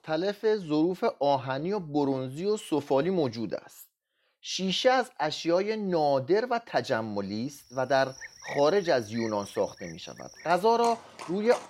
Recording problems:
animal sounds; noticeable; from 7.5 s on; 15 dB below the speech

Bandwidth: 16 kHz